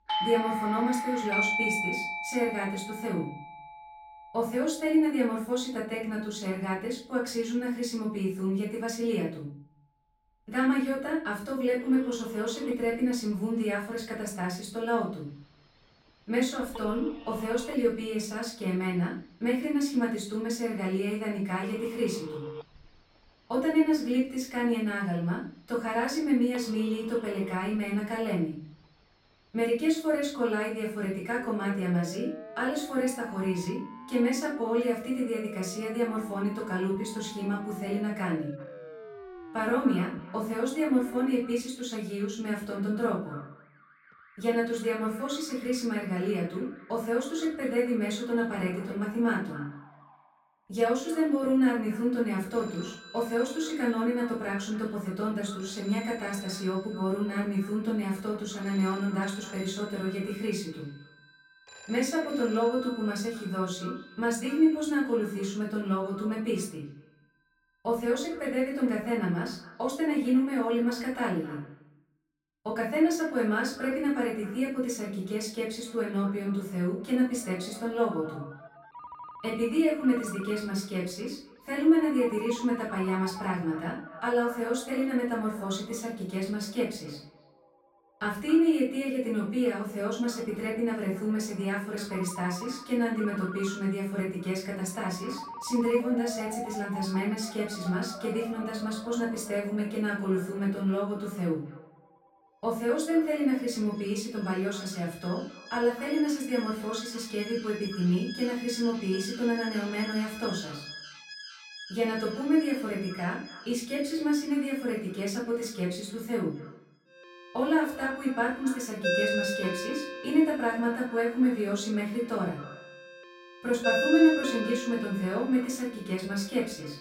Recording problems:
off-mic speech; far
room echo; noticeable; dies away in 0.4 s
echo of what is said; faint; from 39 s on; 260 ms later, 20 dB below the speech
alarms or sirens; loud; throughout; 9 dB below the speech

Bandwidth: 16 kHz